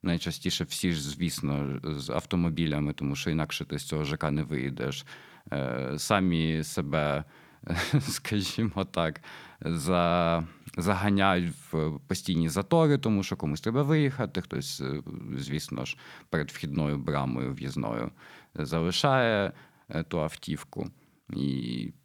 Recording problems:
none

